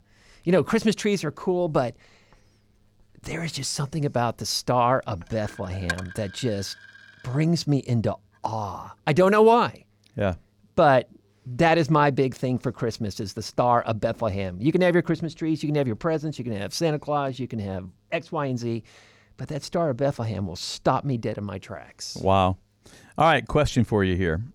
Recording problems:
household noises; noticeable; until 9 s; 15 dB below the speech

